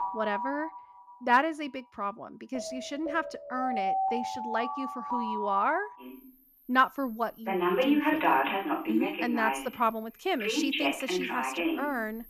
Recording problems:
alarms or sirens; very loud; throughout; 1 dB above the speech

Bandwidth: 14.5 kHz